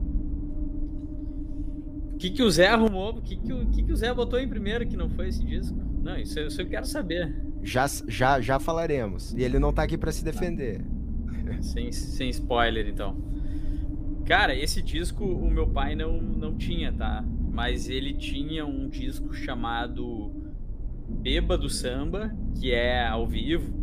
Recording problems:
low rumble; noticeable; throughout; 15 dB below the speech

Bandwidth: 15 kHz